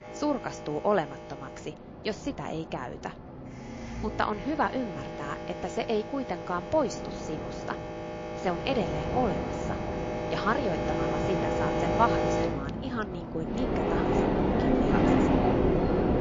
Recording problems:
garbled, watery; slightly
train or aircraft noise; very loud; throughout; 3 dB above the speech

